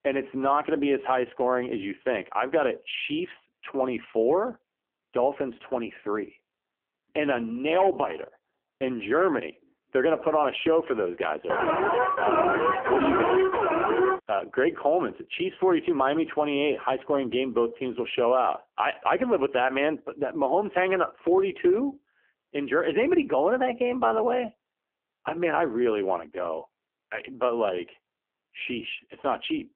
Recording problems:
phone-call audio; poor line; nothing above 3.5 kHz
alarm; loud; from 12 to 14 s; peak 4 dB above the speech

